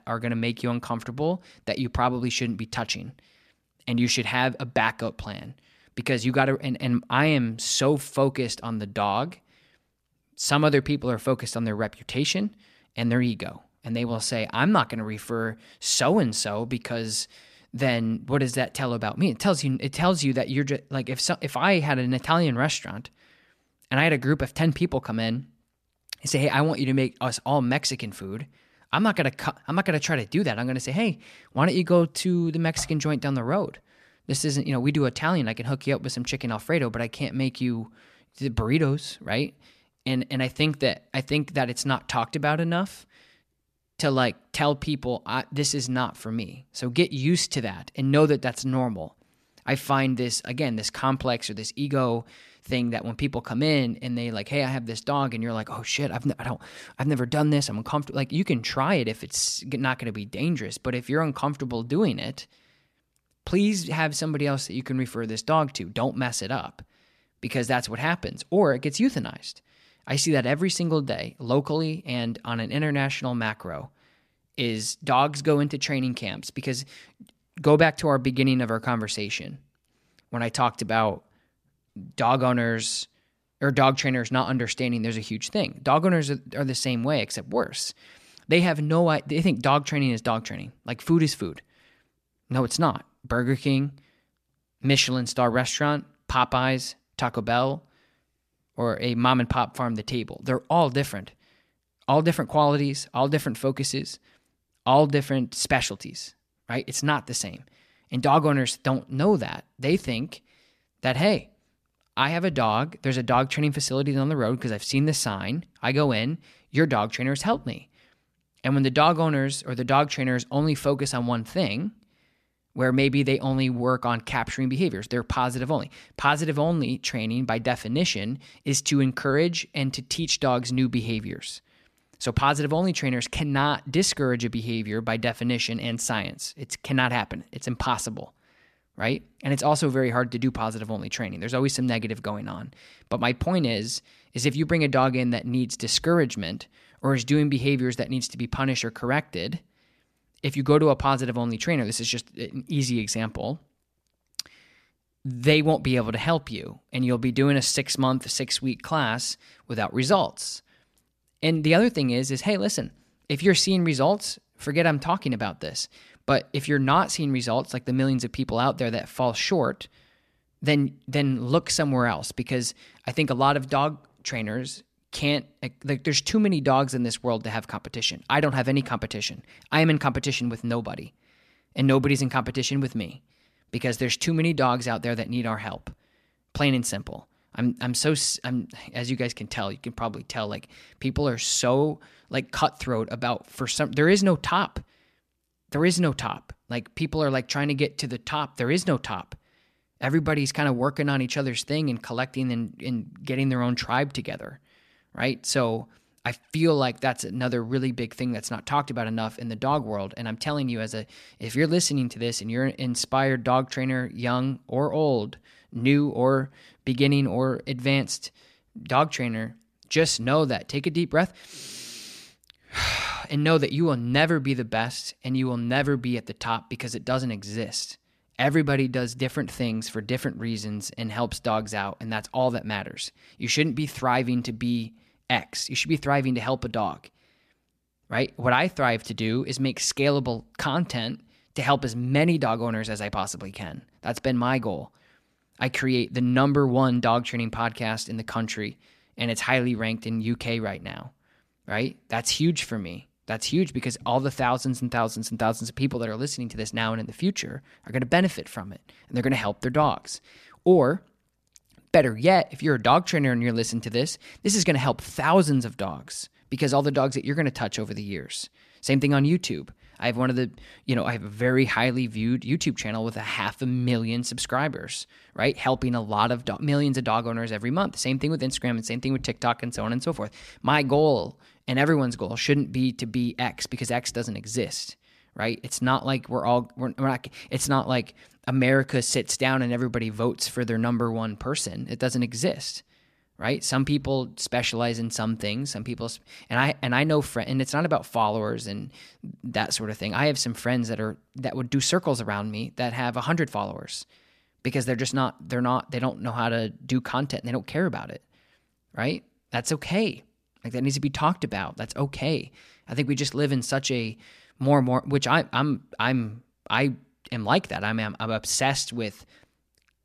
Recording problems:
none

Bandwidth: 14.5 kHz